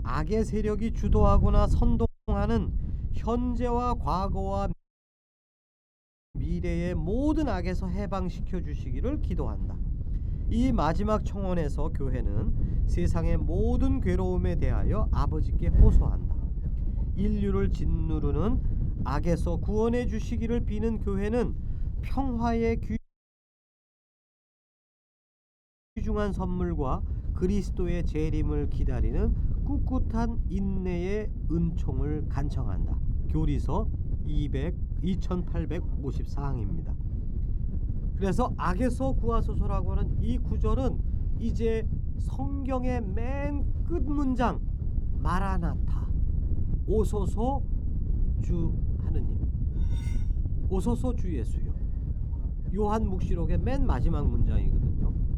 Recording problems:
muffled; slightly; fading above 1.5 kHz
wind noise on the microphone; occasional gusts; 15 dB below the speech
audio cutting out; at 2 s, at 4.5 s for 1.5 s and at 23 s for 3 s
clattering dishes; faint; at 50 s; peak 20 dB below the speech

